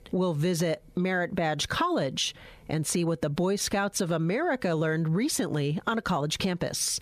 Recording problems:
squashed, flat; heavily

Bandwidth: 14.5 kHz